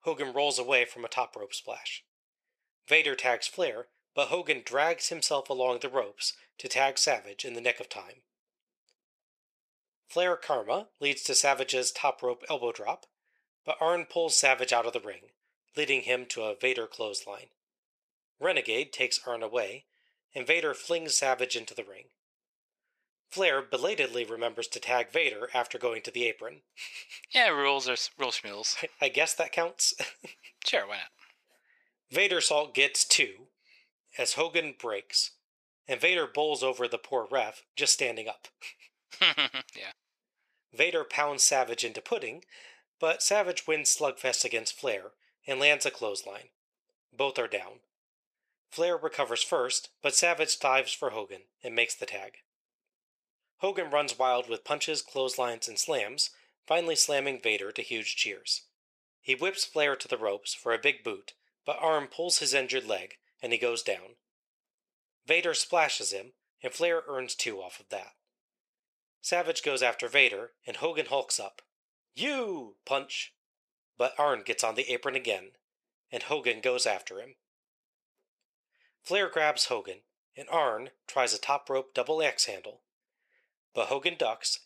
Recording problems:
thin; very; fading below 600 Hz

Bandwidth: 14.5 kHz